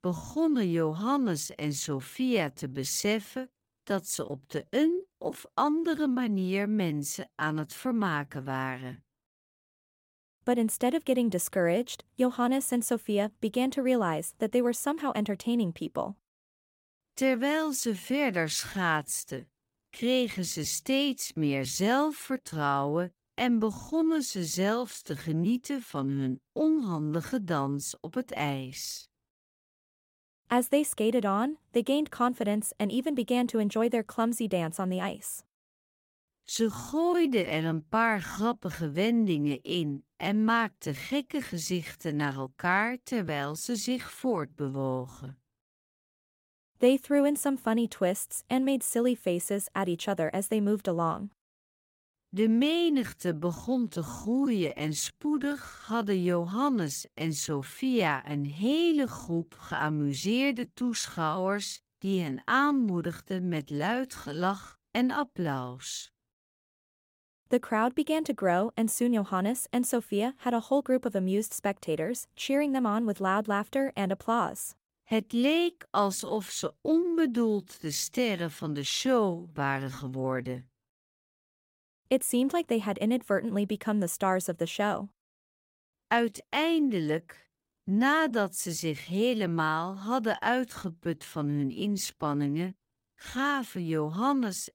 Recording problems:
none

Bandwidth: 16.5 kHz